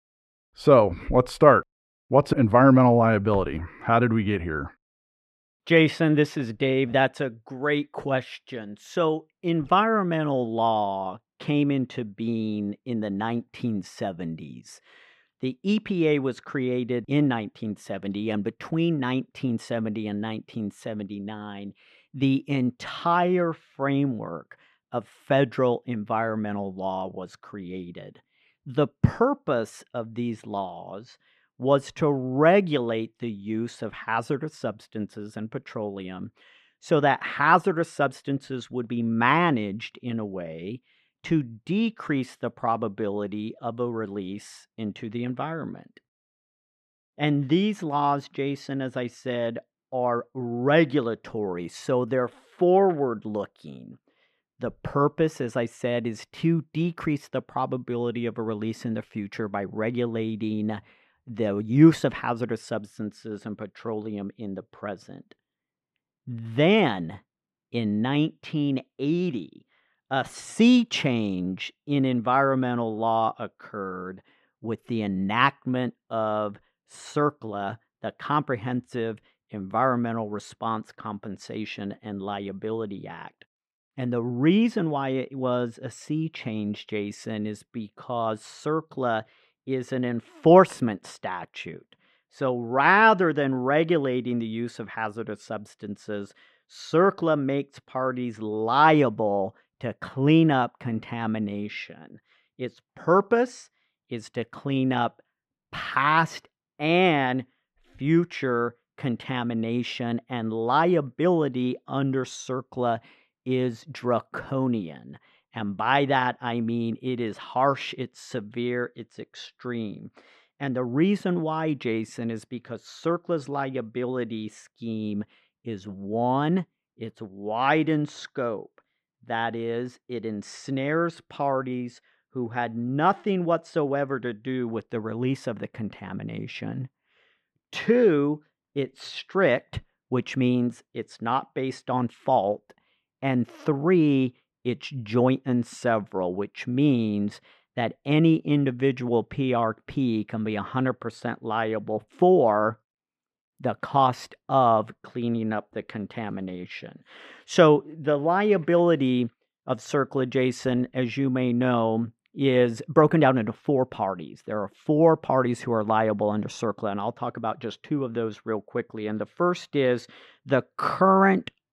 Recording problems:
muffled; slightly; fading above 3.5 kHz

